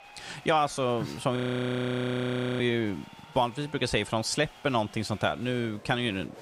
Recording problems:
crowd noise; faint; throughout; 20 dB below the speech
audio freezing; at 1.5 s for 1 s

